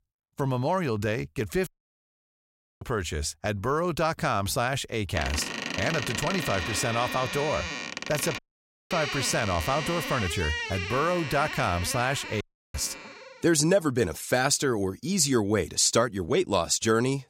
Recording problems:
audio cutting out; at 1.5 s for 1 s, at 8.5 s for 0.5 s and at 12 s
door banging; noticeable; from 5 to 13 s; peak 3 dB below the speech

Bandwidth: 16 kHz